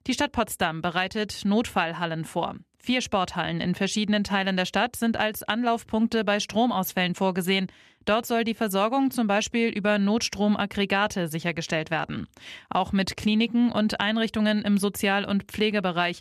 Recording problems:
none

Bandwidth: 14 kHz